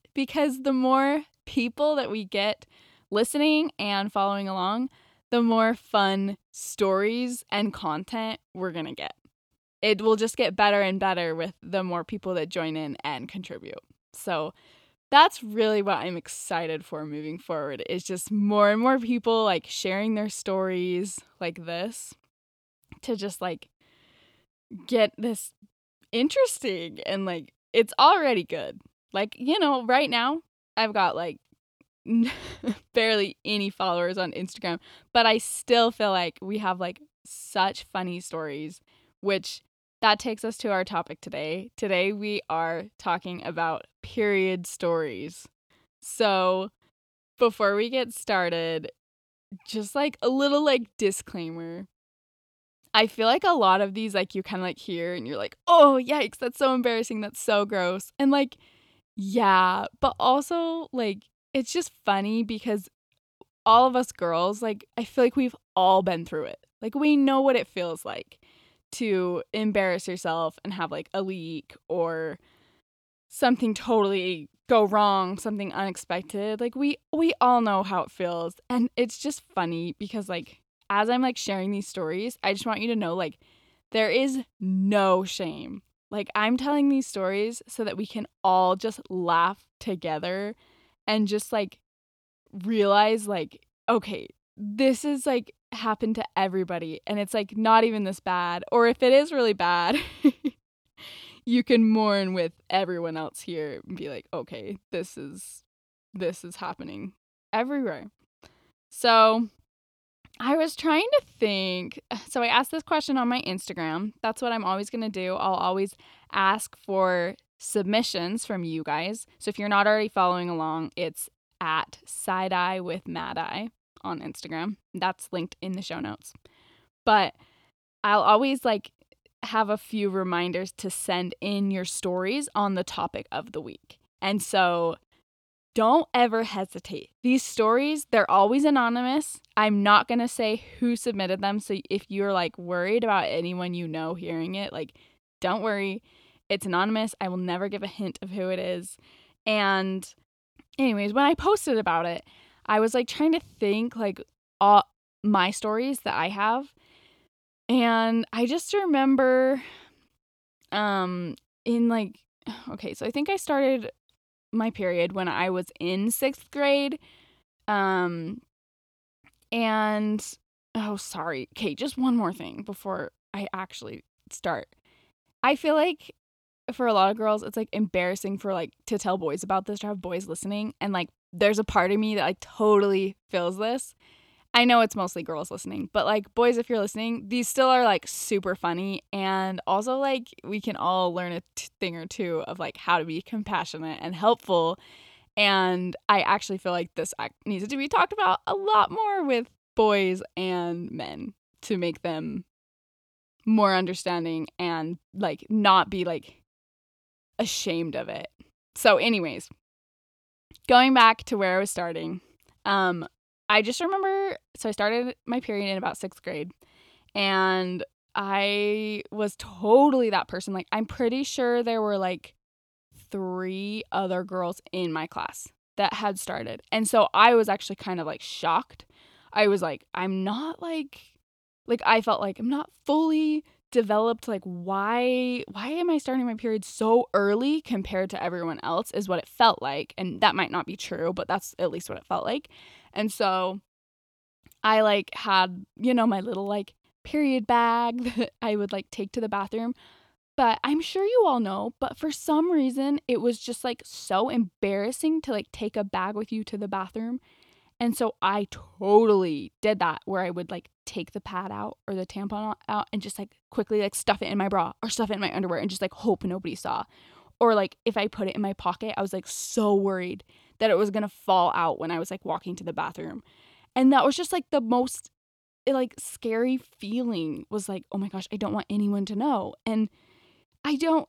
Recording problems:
none

